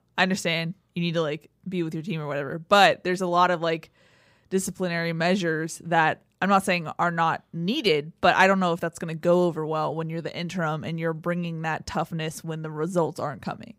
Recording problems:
none

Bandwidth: 15.5 kHz